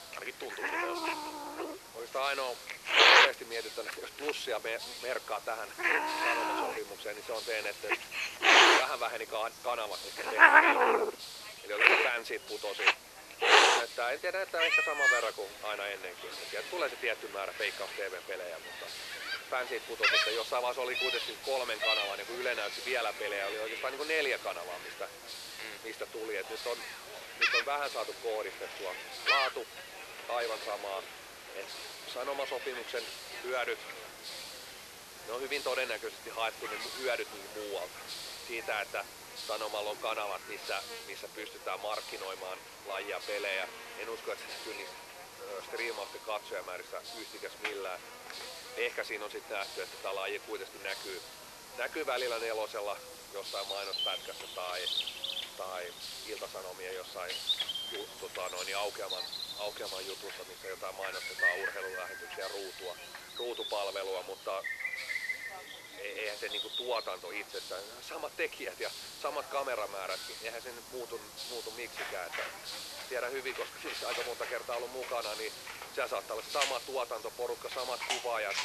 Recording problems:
thin; very; fading below 350 Hz
animal sounds; very loud; throughout; 9 dB above the speech
hiss; loud; throughout; 7 dB below the speech
background chatter; noticeable; throughout; 4 voices, 20 dB below the speech

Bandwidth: 13.5 kHz